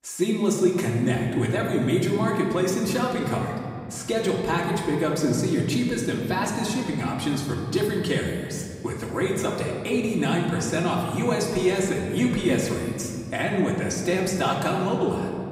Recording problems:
off-mic speech; far
room echo; noticeable; dies away in 2.1 s

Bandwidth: 15.5 kHz